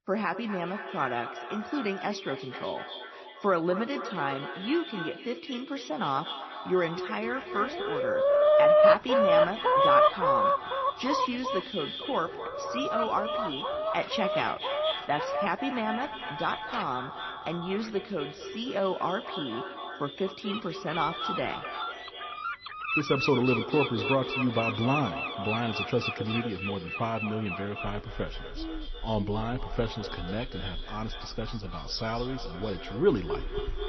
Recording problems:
echo of what is said; strong; throughout; 240 ms later, 7 dB below the speech
garbled, watery; slightly; nothing above 6 kHz
animal sounds; very loud; from 7 s on; 4 dB above the speech

